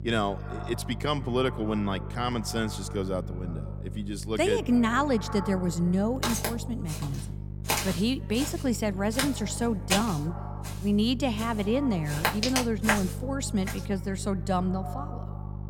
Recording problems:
echo of what is said; noticeable; throughout; 140 ms later, 15 dB below the speech
electrical hum; noticeable; throughout; 50 Hz, 20 dB below the speech
footsteps; loud; from 6 to 14 s; peak 2 dB above the speech

